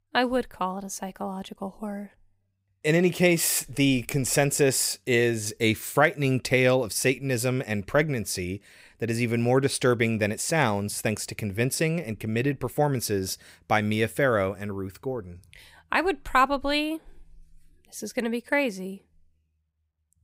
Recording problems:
none

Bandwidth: 15.5 kHz